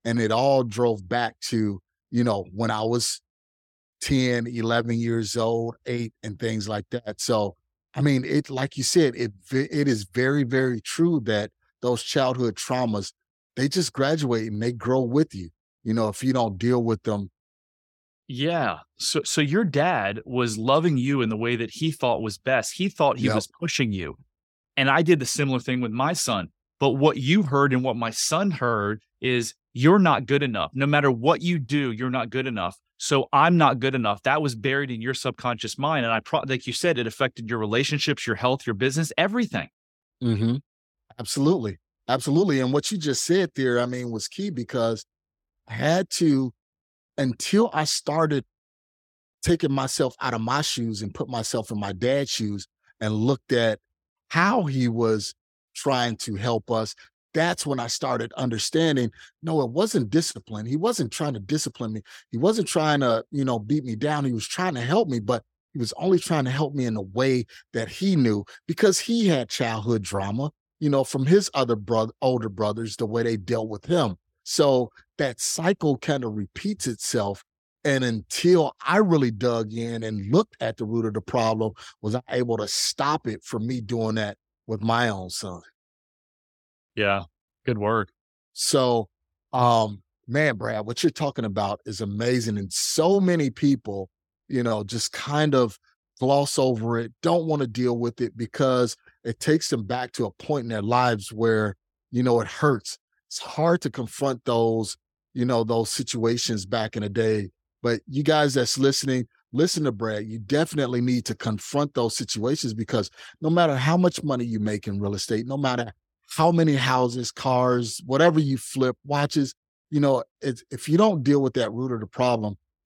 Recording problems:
none

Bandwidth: 17 kHz